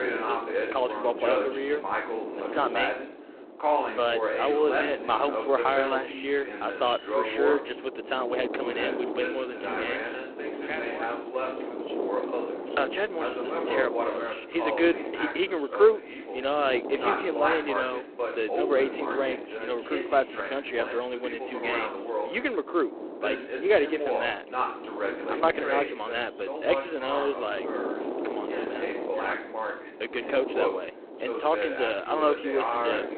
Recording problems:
phone-call audio; poor line
voice in the background; loud; throughout; 4 dB below the speech
wind noise on the microphone; occasional gusts; 10 dB below the speech

